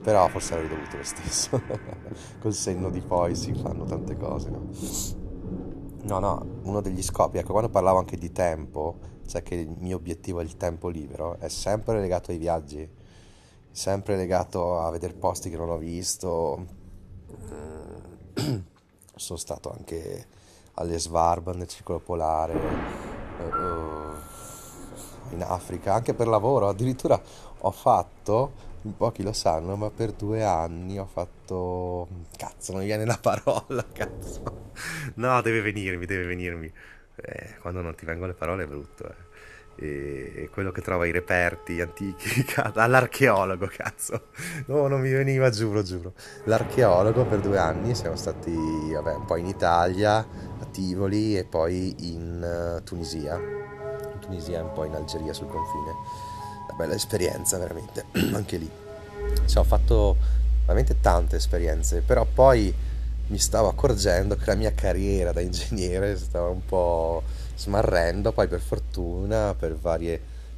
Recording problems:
background music; loud; throughout; 5 dB below the speech
rain or running water; noticeable; throughout; 15 dB below the speech

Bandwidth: 13.5 kHz